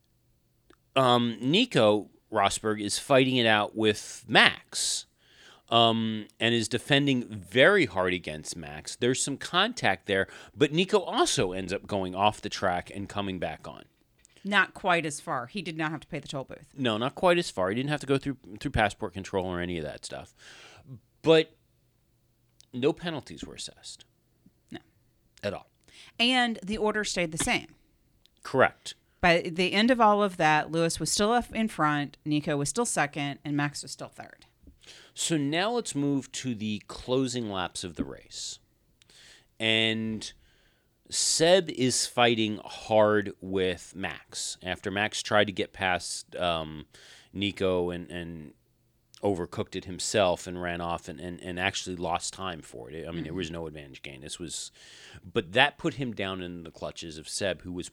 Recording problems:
none

